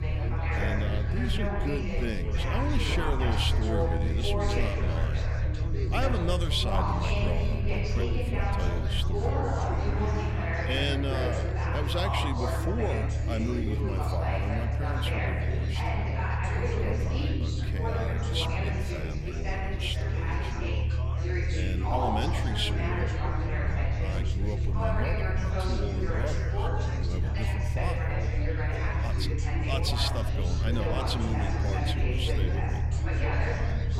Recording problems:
chatter from many people; very loud; throughout; as loud as the speech
low rumble; loud; throughout; 10 dB below the speech
background music; noticeable; throughout; 20 dB below the speech

